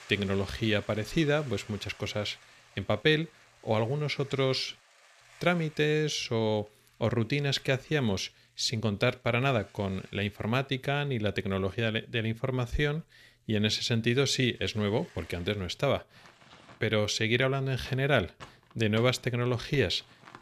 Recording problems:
household noises; faint; throughout; 25 dB below the speech

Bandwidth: 14.5 kHz